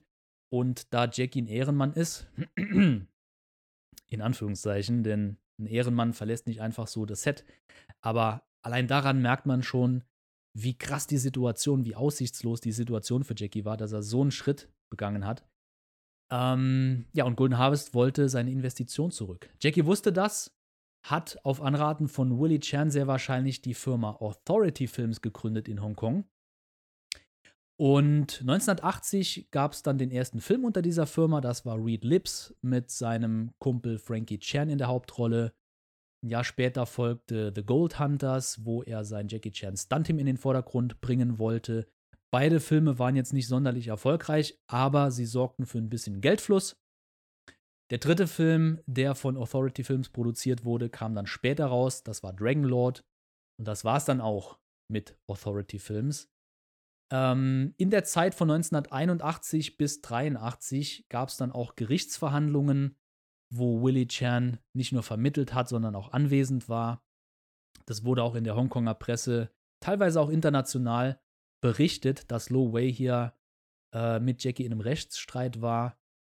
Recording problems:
none

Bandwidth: 17.5 kHz